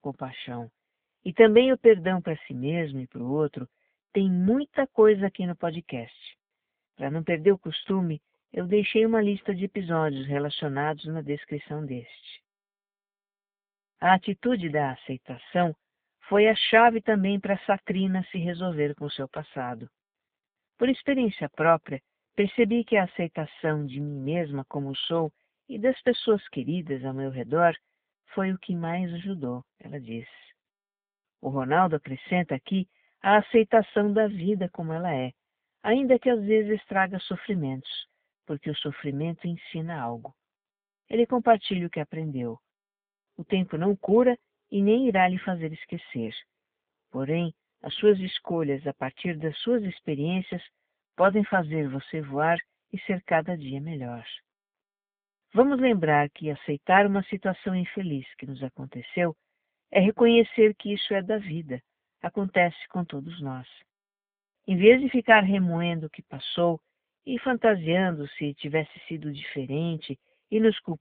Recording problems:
phone-call audio

